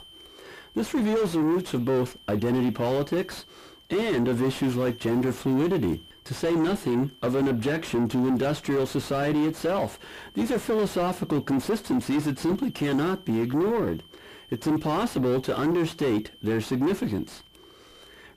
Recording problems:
distortion; heavy; 6 dB below the speech

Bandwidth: 15 kHz